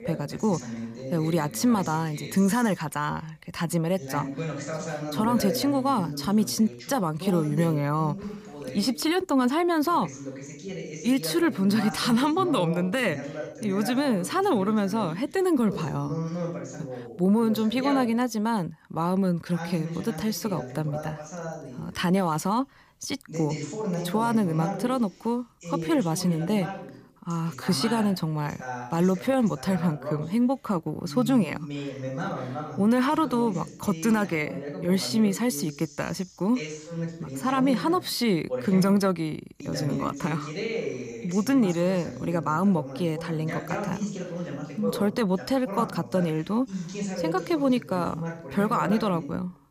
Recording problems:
voice in the background; loud; throughout; 9 dB below the speech

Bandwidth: 15 kHz